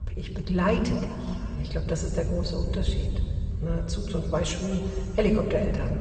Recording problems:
room echo; noticeable; dies away in 2.4 s
off-mic speech; somewhat distant
garbled, watery; slightly; nothing above 8 kHz
low rumble; noticeable; throughout; 20 dB below the speech

